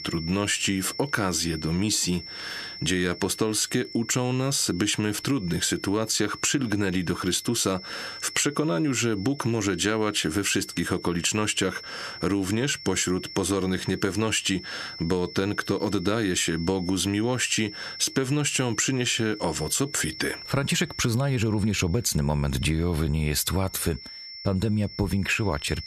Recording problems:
squashed, flat; somewhat
high-pitched whine; noticeable; throughout; 5.5 kHz, 15 dB below the speech

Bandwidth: 13.5 kHz